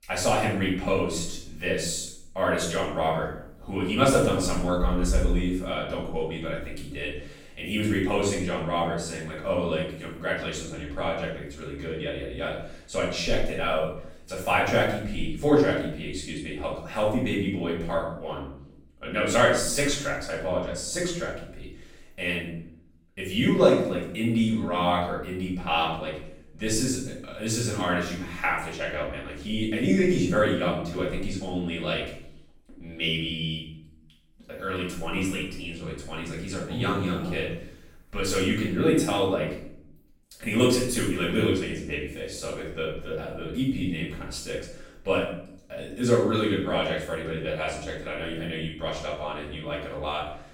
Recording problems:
off-mic speech; far
room echo; noticeable; dies away in 0.6 s

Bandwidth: 16.5 kHz